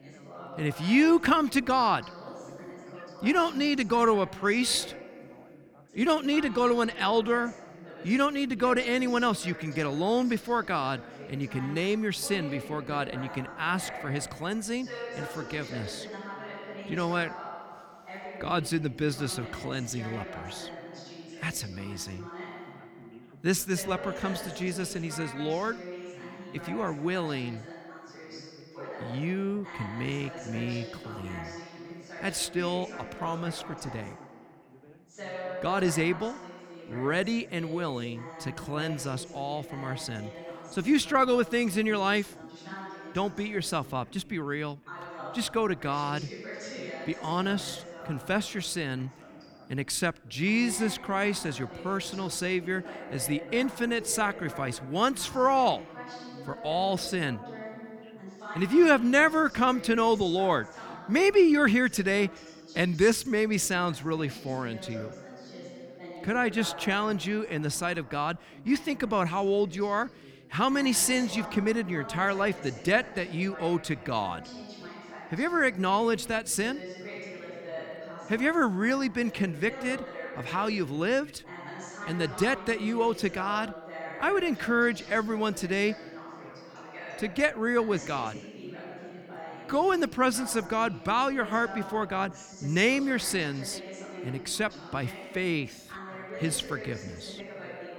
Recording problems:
background chatter; noticeable; throughout; 2 voices, 15 dB below the speech

